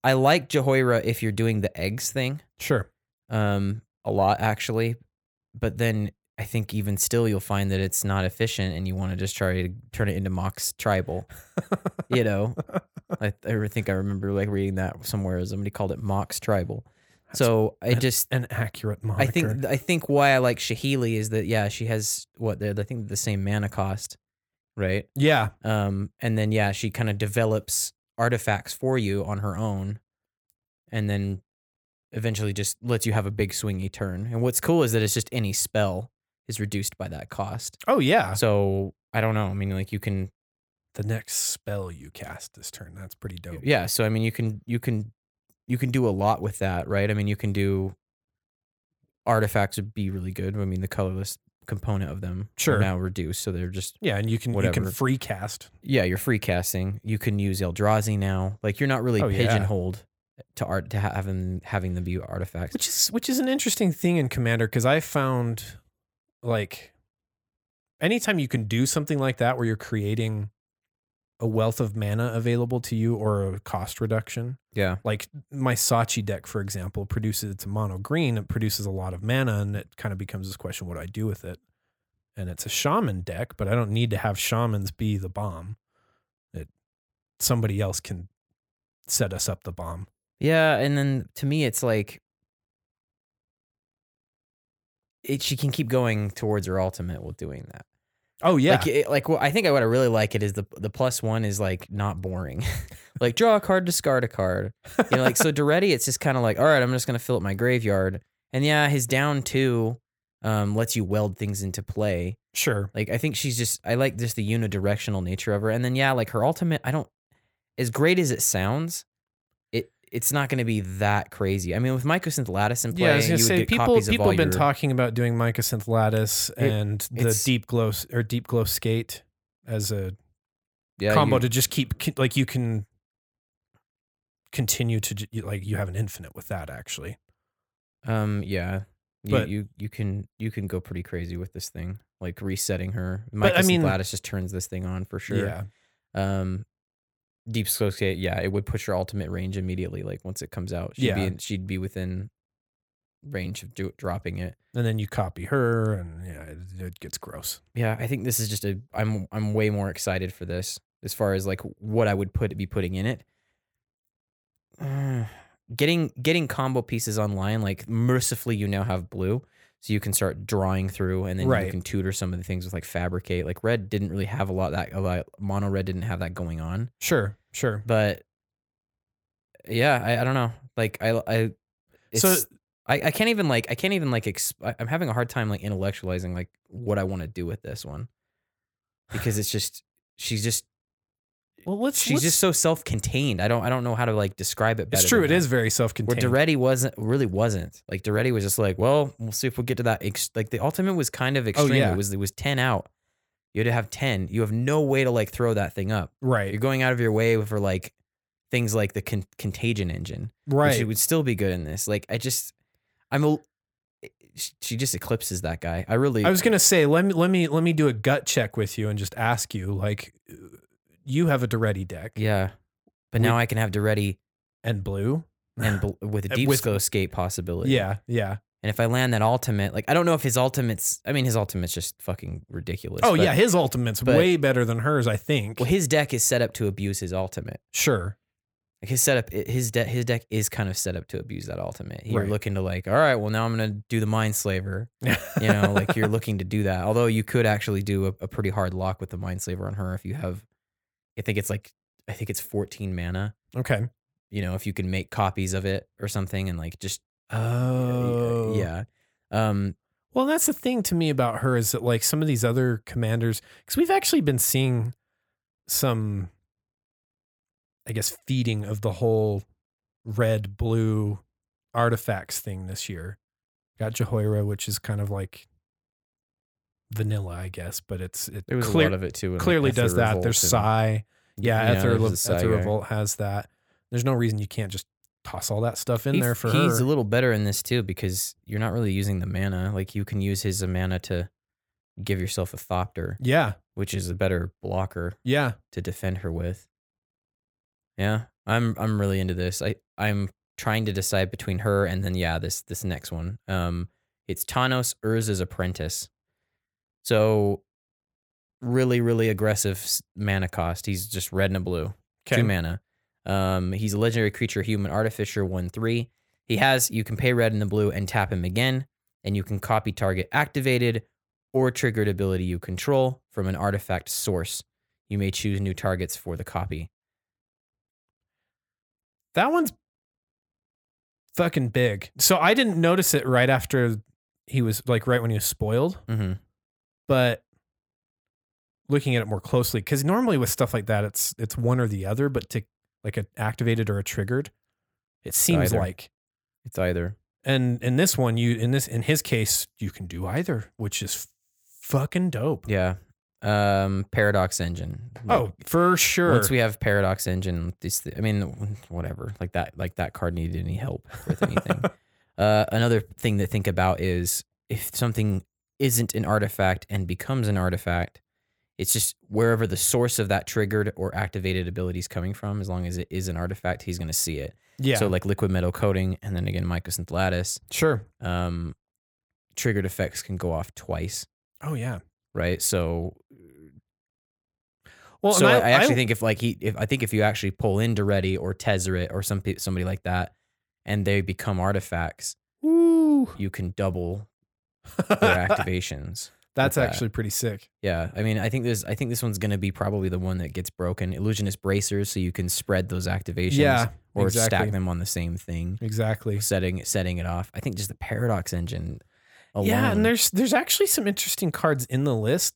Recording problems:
none

